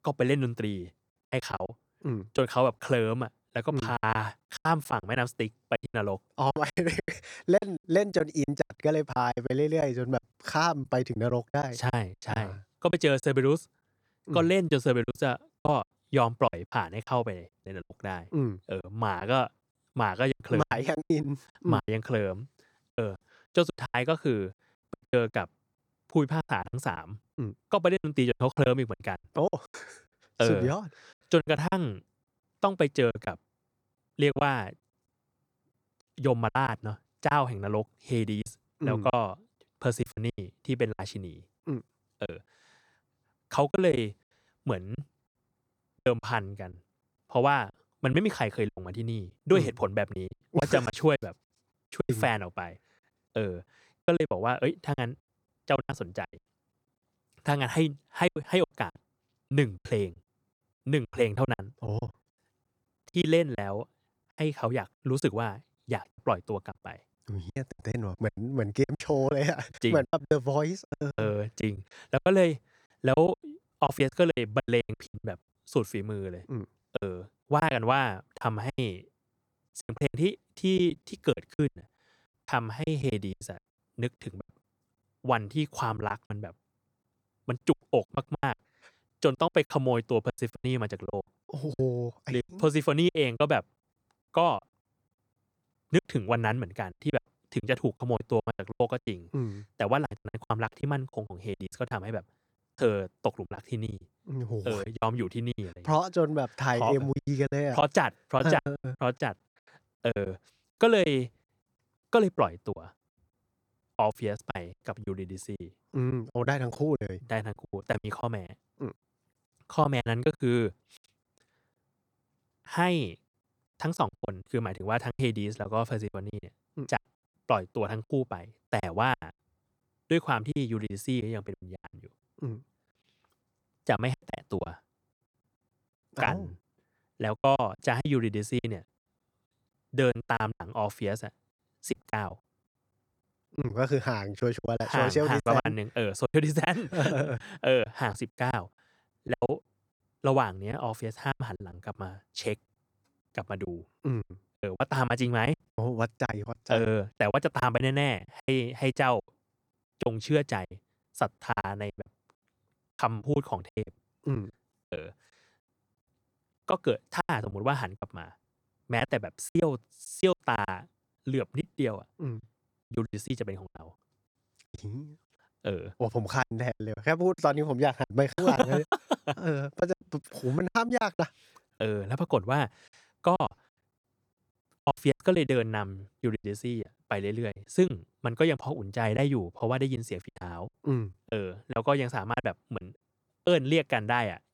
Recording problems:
choppy; very; 14% of the speech affected

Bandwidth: 18.5 kHz